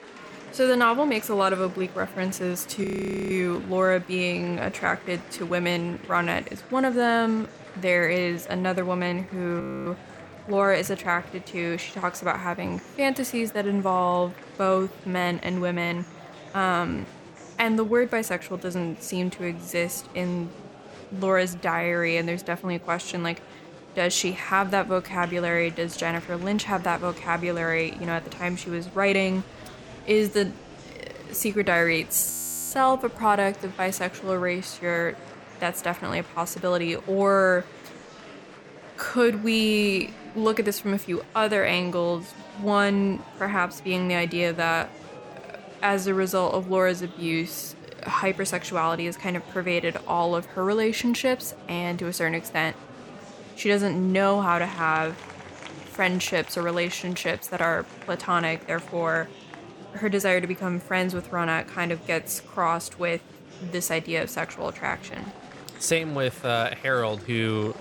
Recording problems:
murmuring crowd; noticeable; throughout; 20 dB below the speech
audio freezing; at 3 s, at 9.5 s and at 32 s

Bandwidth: 18.5 kHz